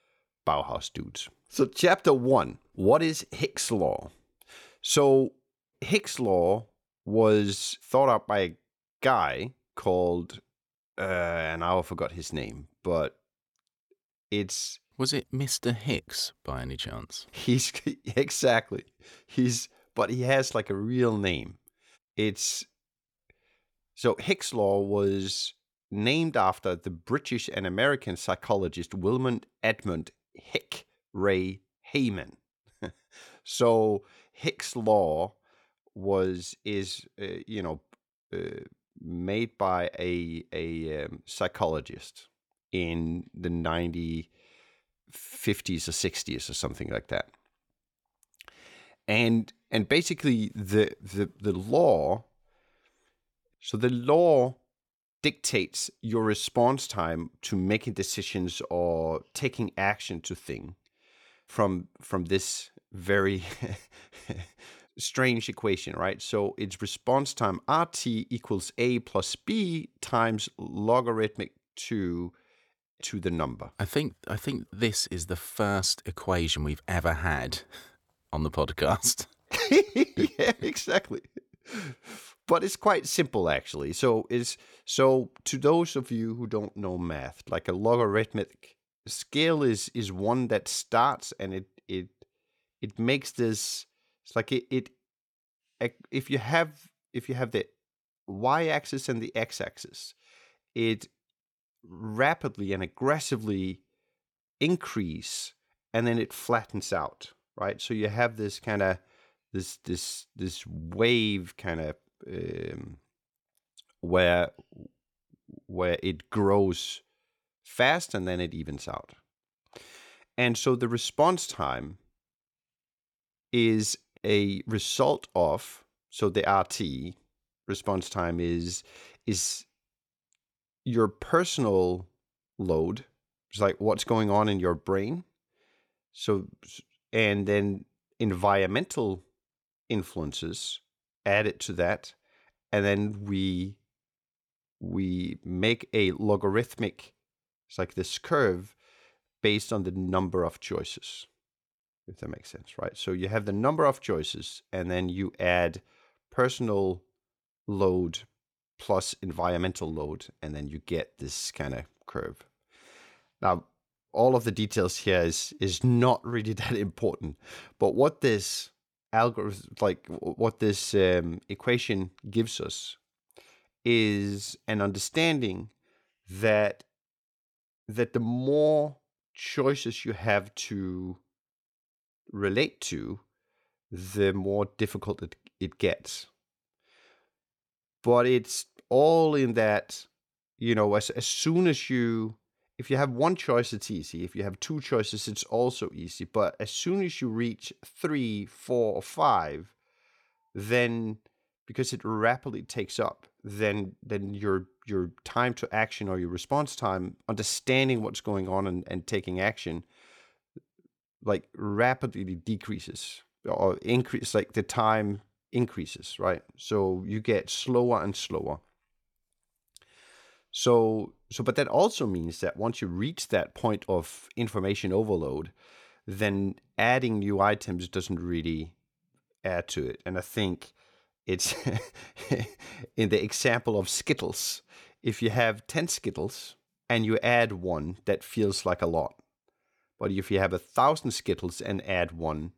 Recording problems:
none

